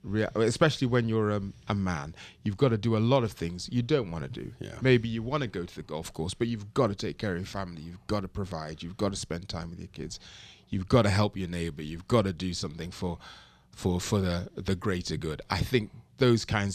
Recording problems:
abrupt cut into speech; at the end

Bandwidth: 14 kHz